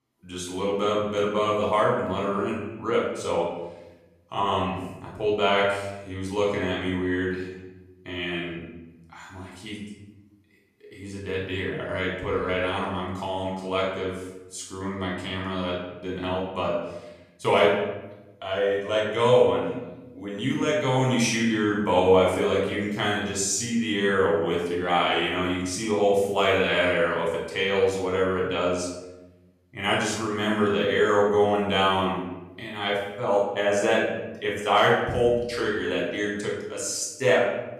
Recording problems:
off-mic speech; far
room echo; noticeable; dies away in 1 s

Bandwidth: 14.5 kHz